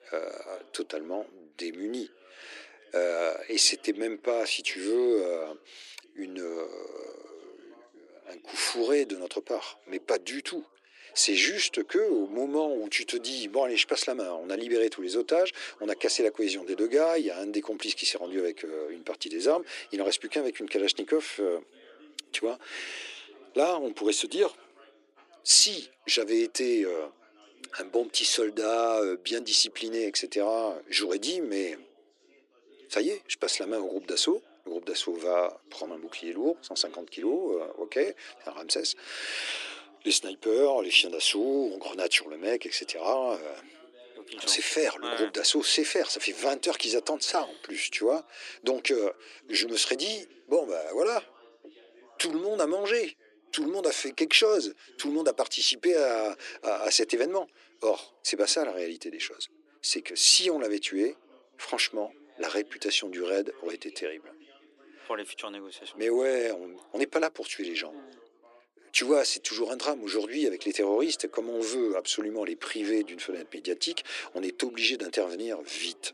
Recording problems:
thin; somewhat; fading below 300 Hz
background chatter; faint; throughout; 2 voices, 30 dB below the speech

